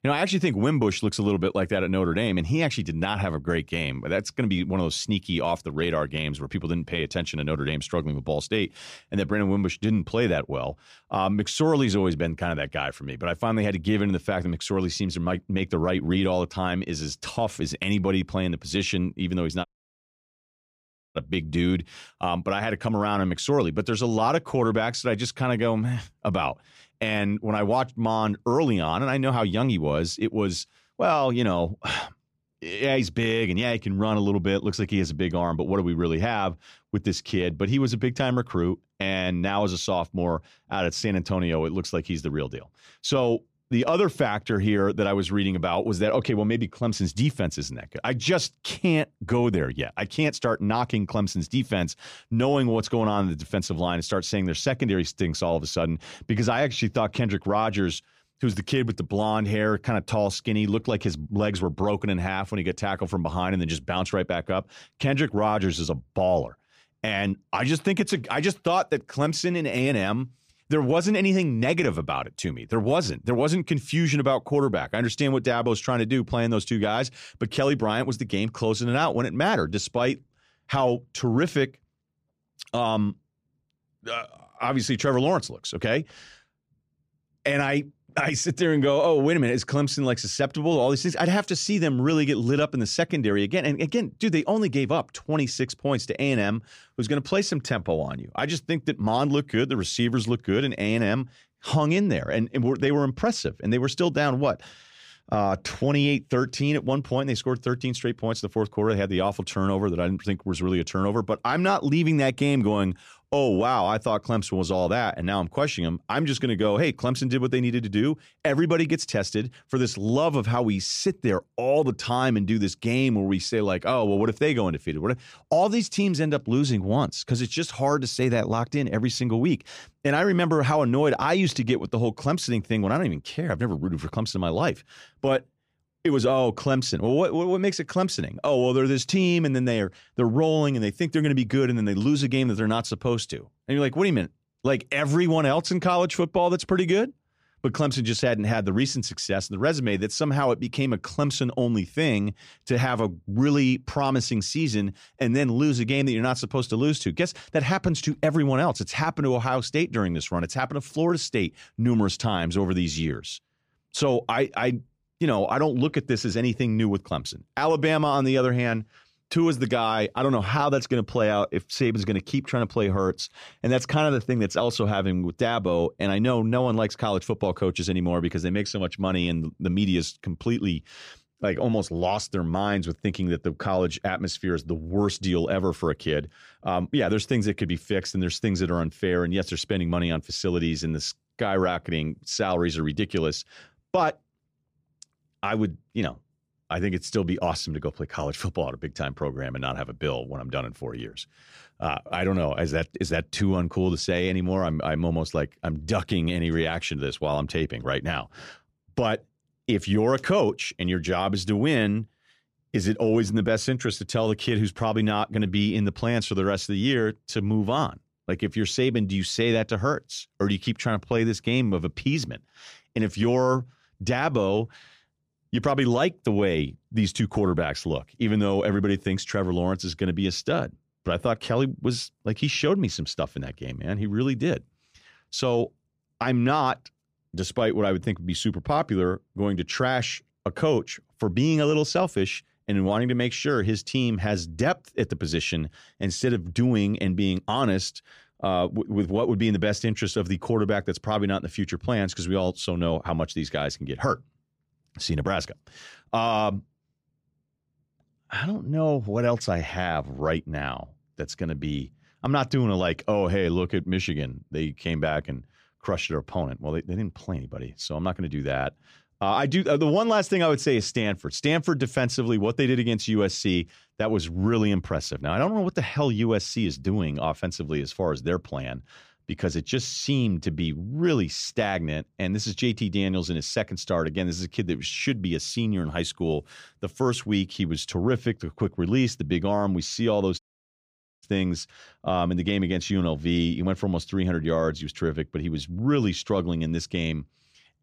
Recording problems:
audio cutting out; at 20 s for 1.5 s and at 4:50 for 1 s

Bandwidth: 15 kHz